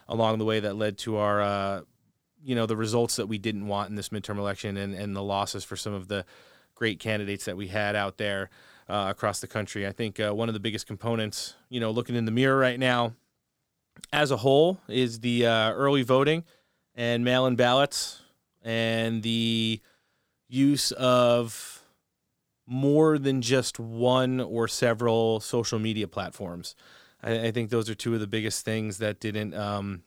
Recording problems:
none

